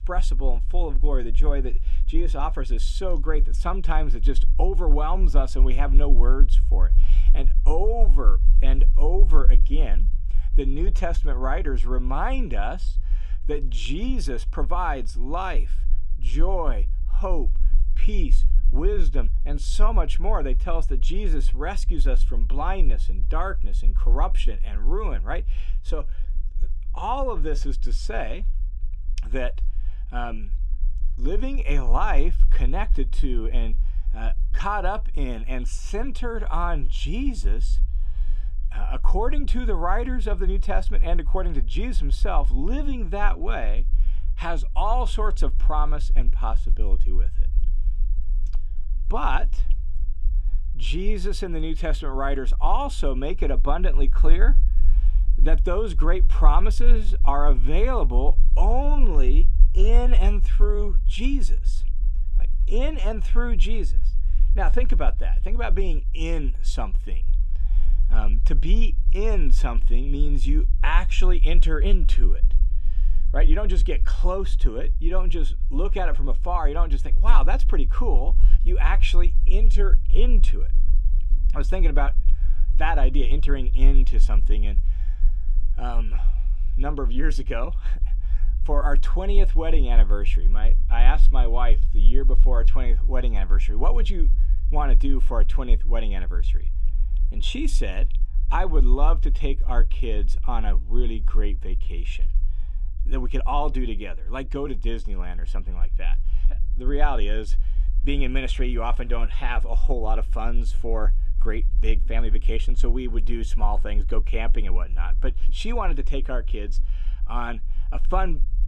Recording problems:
low rumble; faint; throughout; 20 dB below the speech

